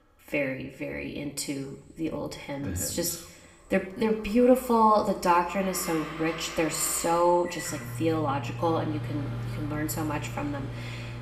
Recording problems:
room echo; slight; dies away in 0.7 s
off-mic speech; somewhat distant
household noises; noticeable; from 3.5 s on; 10 dB below the speech

